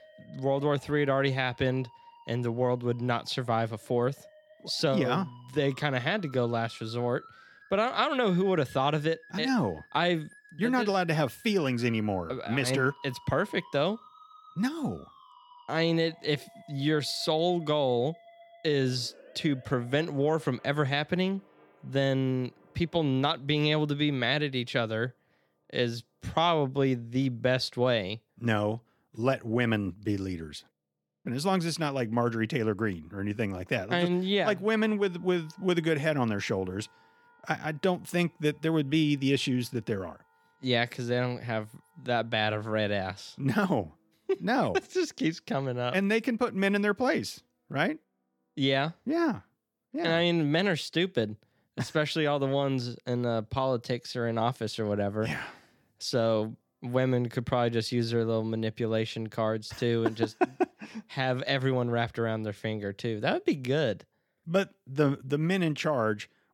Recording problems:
background music; faint; throughout; 25 dB below the speech

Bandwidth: 18 kHz